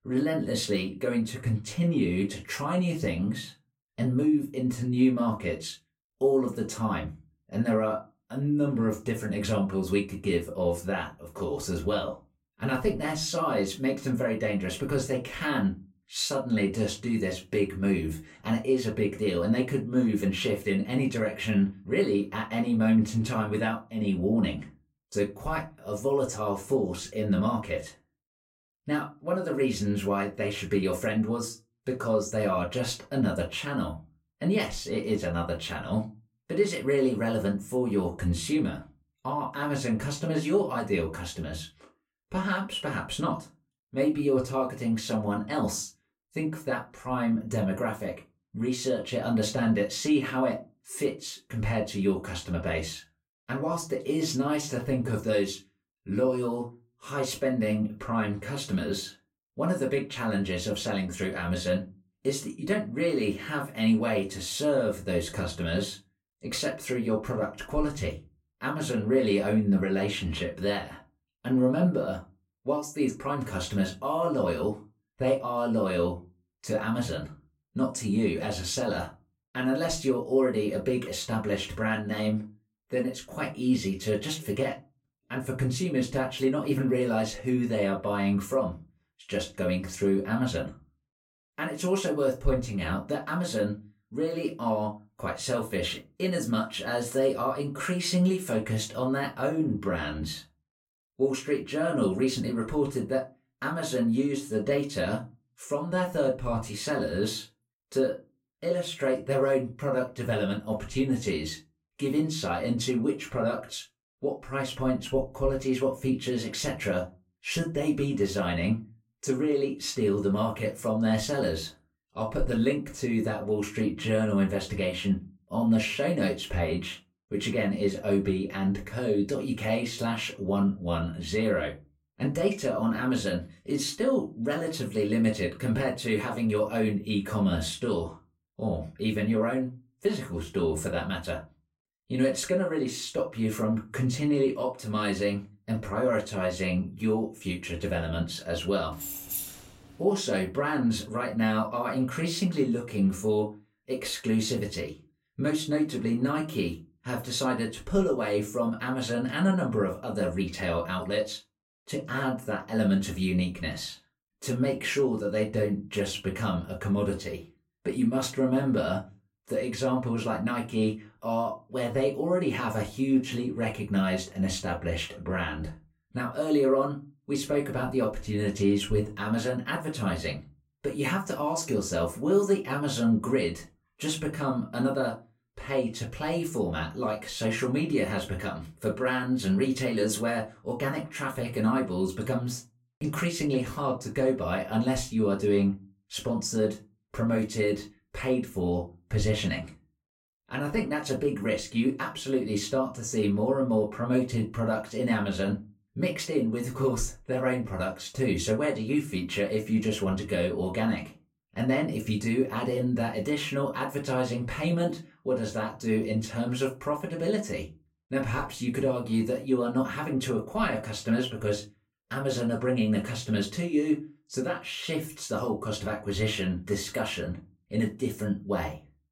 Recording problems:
off-mic speech; far
room echo; very slight; dies away in 0.2 s
jangling keys; noticeable; at 2:29; peak 3 dB below the speech

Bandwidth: 16 kHz